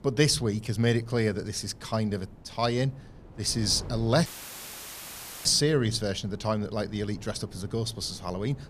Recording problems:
wind noise on the microphone; occasional gusts; 25 dB below the speech
audio cutting out; filled with static; at 4.5 s for 1 s

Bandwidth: 14.5 kHz